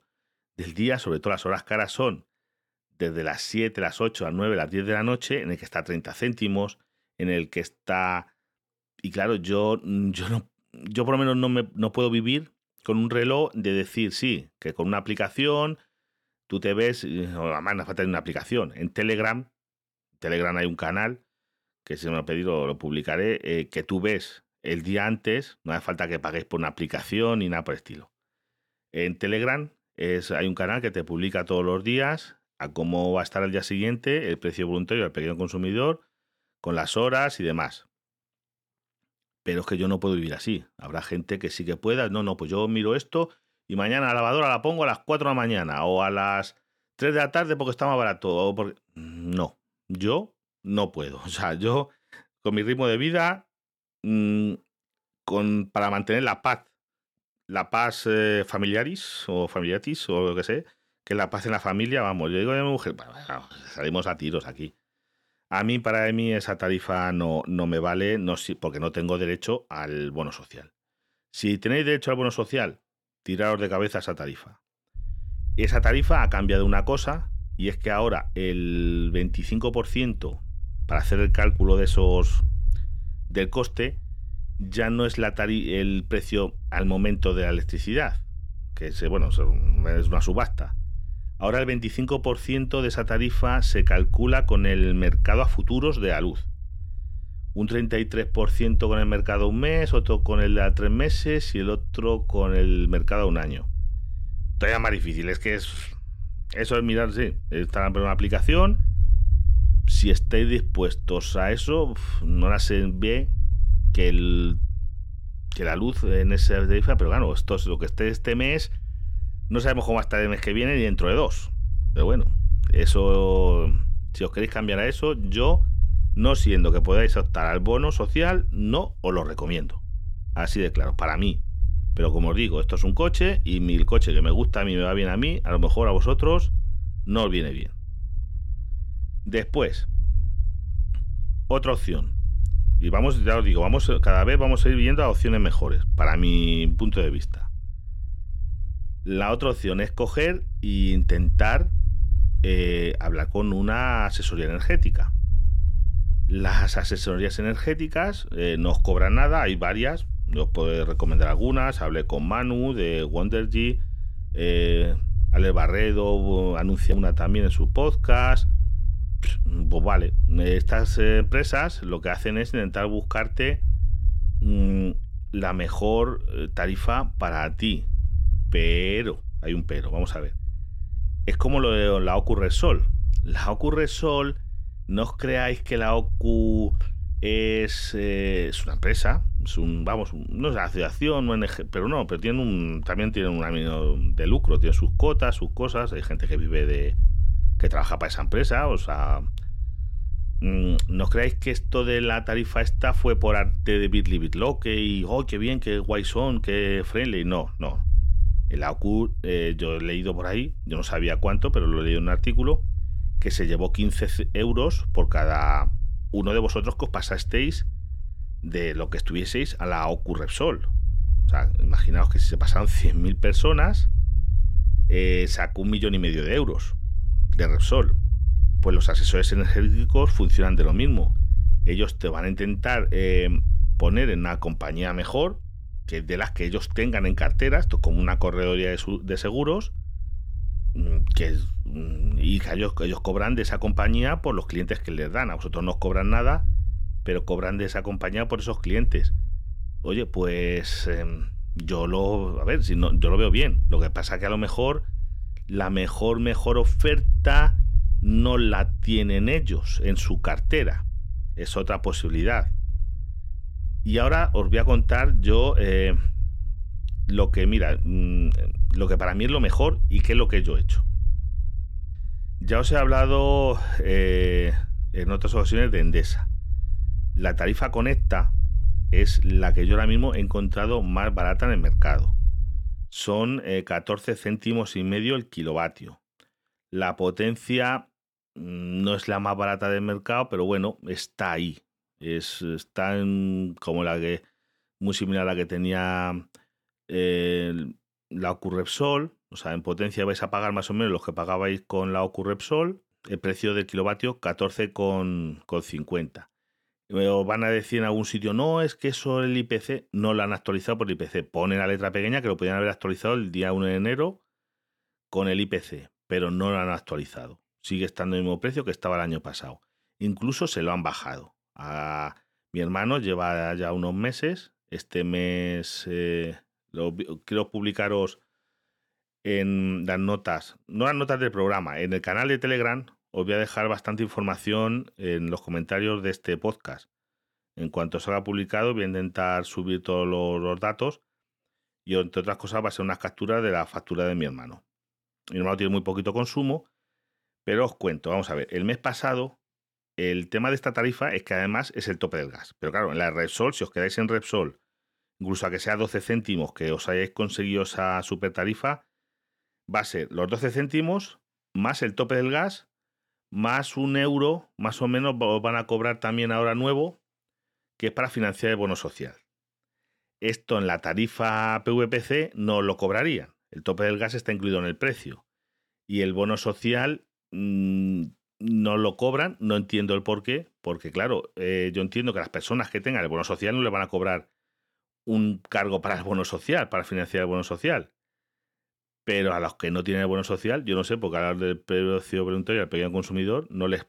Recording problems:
low rumble; faint; from 1:15 to 4:43; 20 dB below the speech

